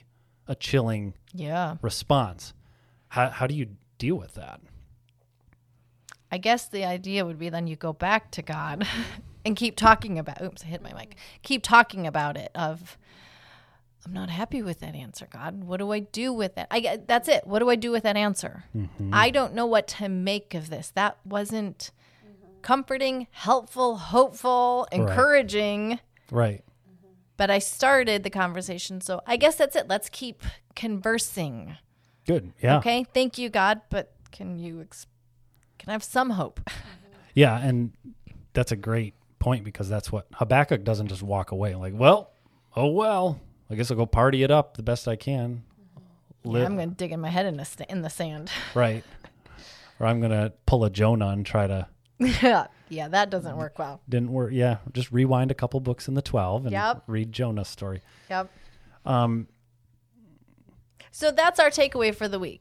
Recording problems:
none

